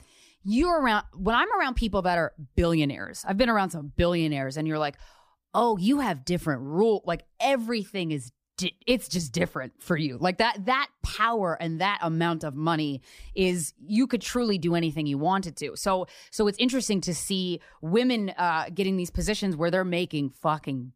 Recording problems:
none

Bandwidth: 15 kHz